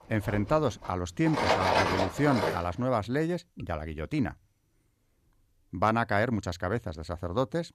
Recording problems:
machinery noise; very faint; until 2.5 s; 1 dB above the speech

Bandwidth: 14.5 kHz